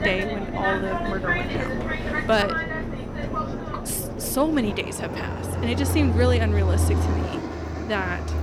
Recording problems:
train or aircraft noise; very loud; throughout; as loud as the speech

